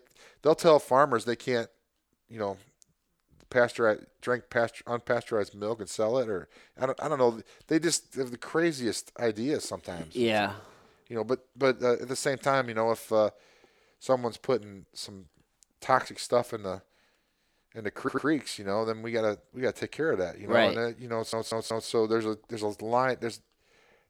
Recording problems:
audio stuttering; at 18 s and at 21 s

